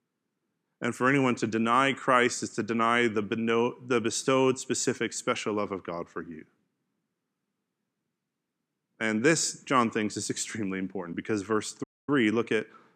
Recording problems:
audio cutting out; at 12 s

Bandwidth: 14.5 kHz